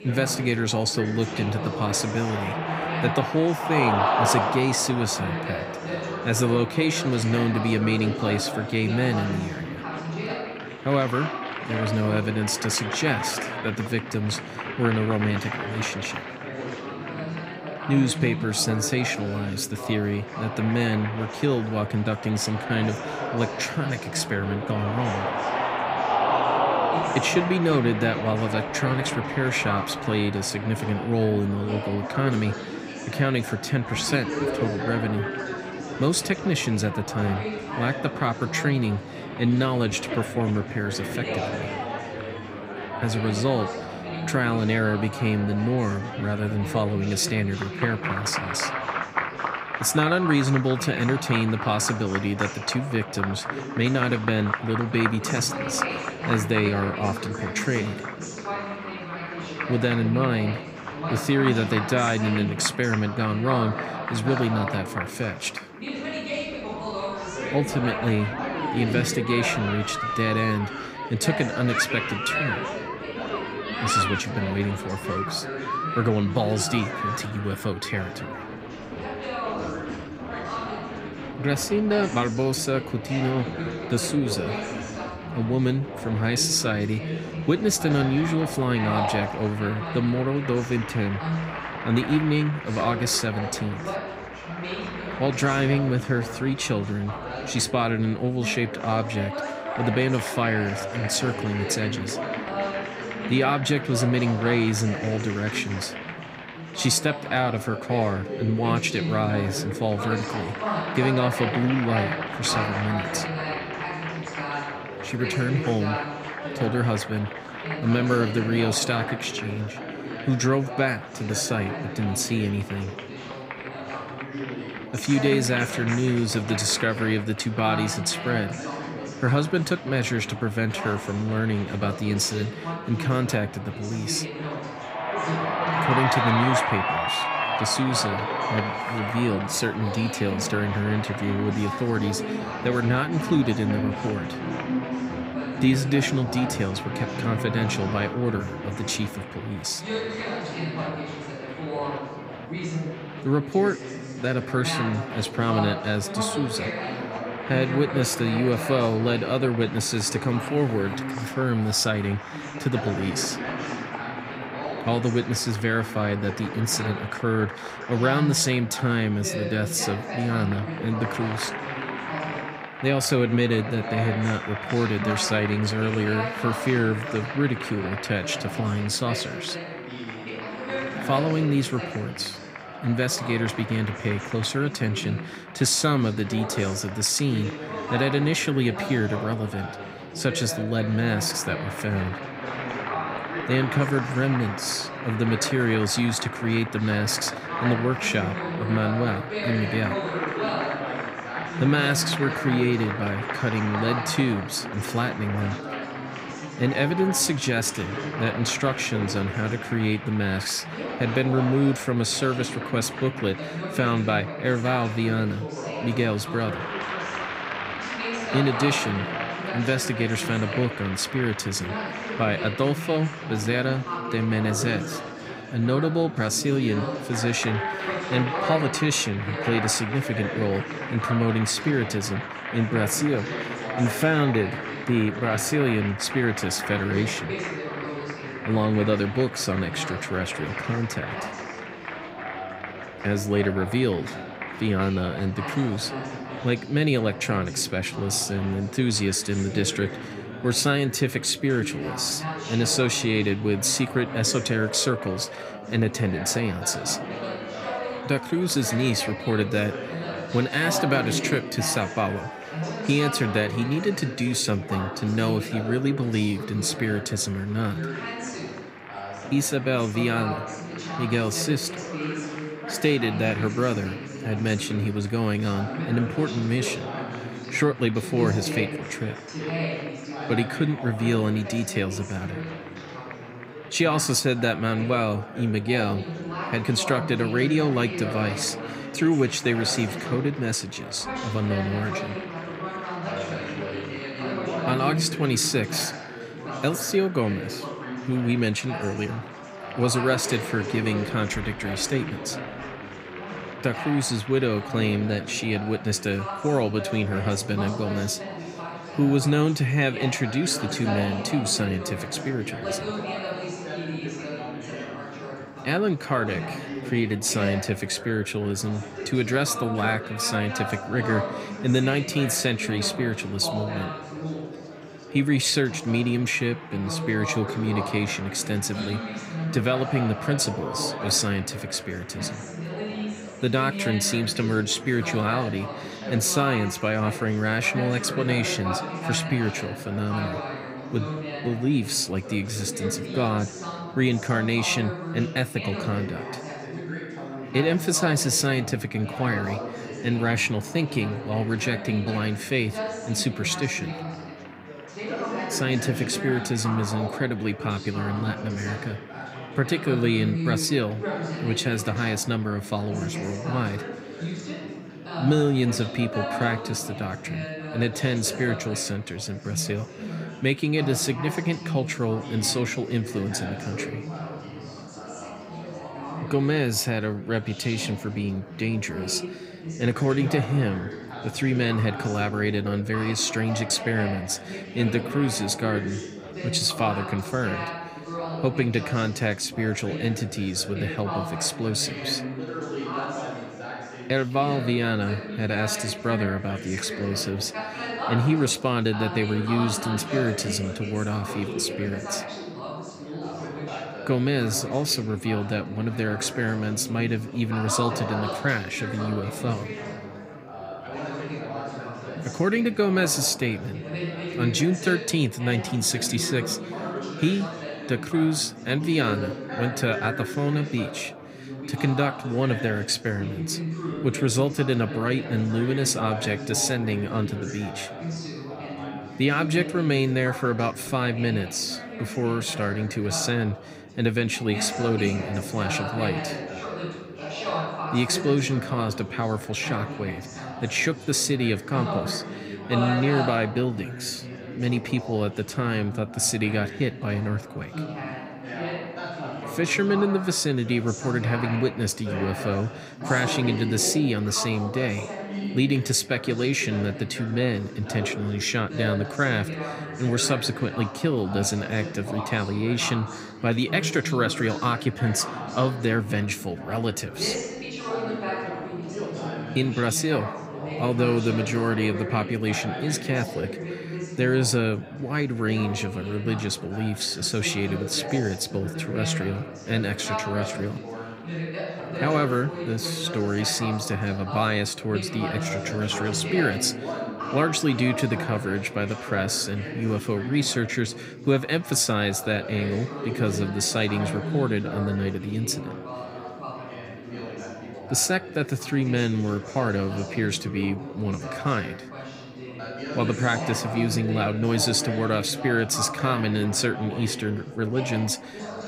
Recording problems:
chatter from many people; loud; throughout; 6 dB below the speech

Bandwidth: 15.5 kHz